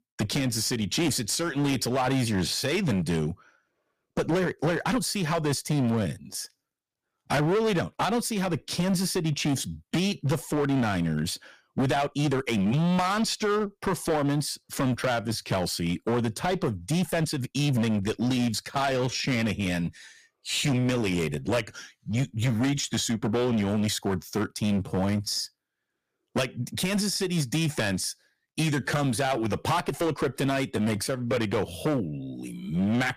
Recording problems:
distortion; heavy; 14% of the sound clipped
uneven, jittery; strongly; from 4 to 32 s

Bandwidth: 15 kHz